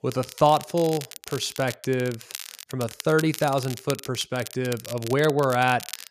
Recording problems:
crackle, like an old record; noticeable; 15 dB below the speech

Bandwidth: 14.5 kHz